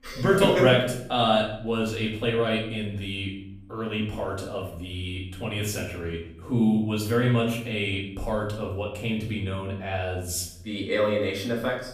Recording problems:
off-mic speech; far
room echo; noticeable; dies away in 0.6 s

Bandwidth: 15 kHz